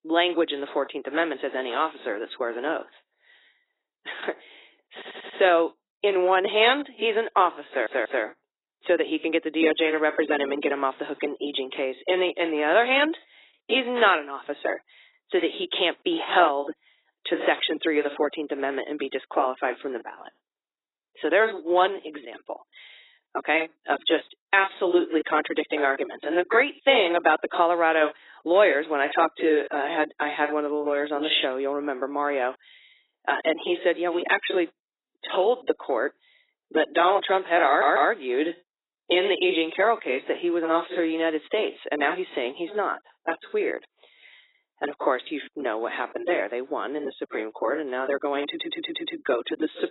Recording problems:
garbled, watery; badly; nothing above 4 kHz
thin; somewhat; fading below 300 Hz
audio stuttering; 4 times, first at 5 s

